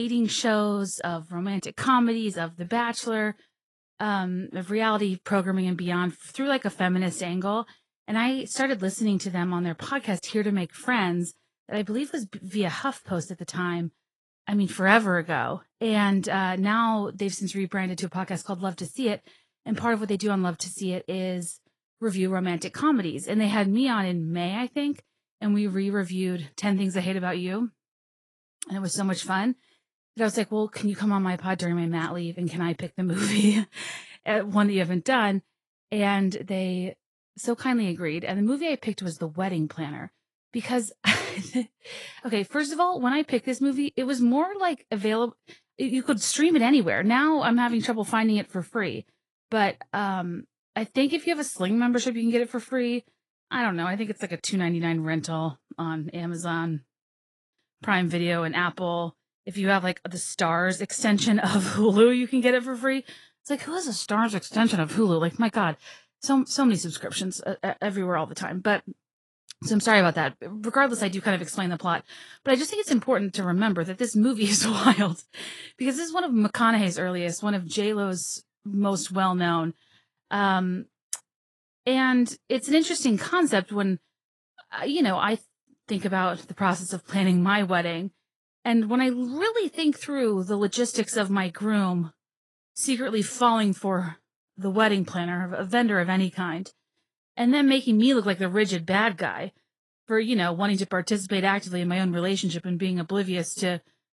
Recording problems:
garbled, watery; slightly; nothing above 10.5 kHz
abrupt cut into speech; at the start

